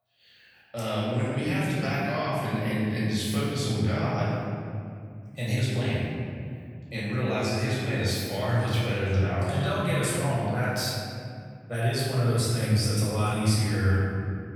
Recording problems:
room echo; strong; dies away in 2.3 s
off-mic speech; far

